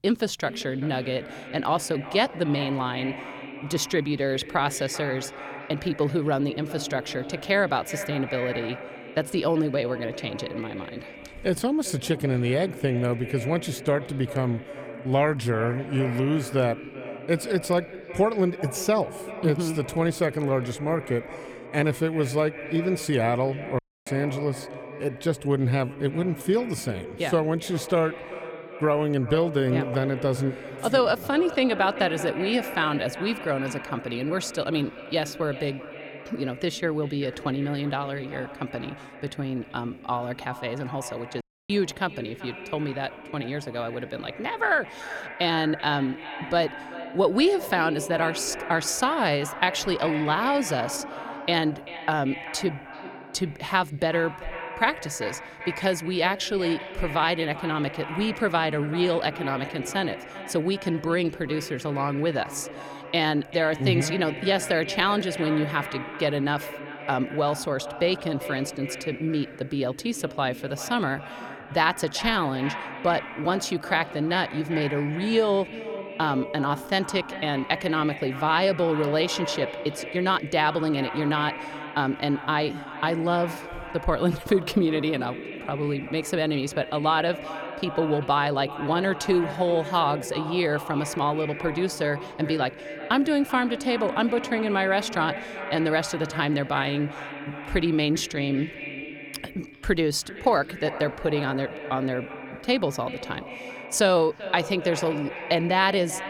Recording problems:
echo of what is said; strong; throughout; 390 ms later, 10 dB below the speech
audio cutting out; at 24 s and at 41 s

